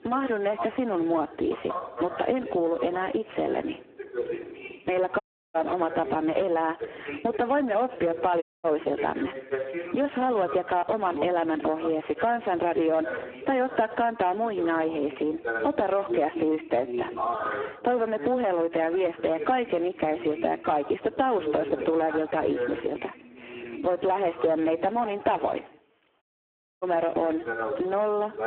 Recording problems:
phone-call audio; poor line
distortion; slight; 10 dB below the speech
squashed, flat; somewhat, background pumping
voice in the background; loud; throughout; 9 dB below the speech
audio cutting out; at 5 s, at 8.5 s and at 26 s for 0.5 s

